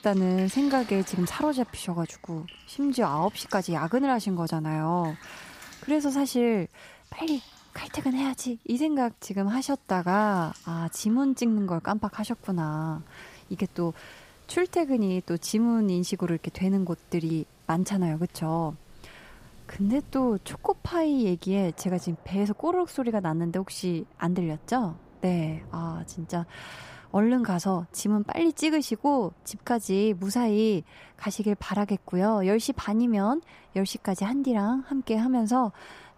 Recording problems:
rain or running water; faint; throughout; 25 dB below the speech

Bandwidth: 15 kHz